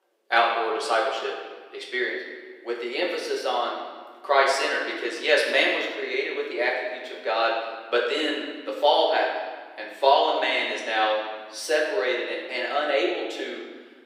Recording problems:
off-mic speech; far
thin; very; fading below 350 Hz
room echo; noticeable; dies away in 1.4 s

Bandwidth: 15.5 kHz